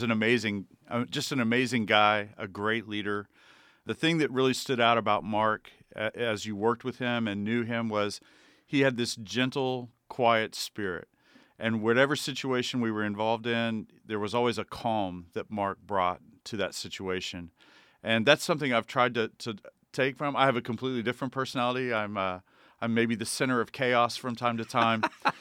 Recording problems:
abrupt cut into speech; at the start

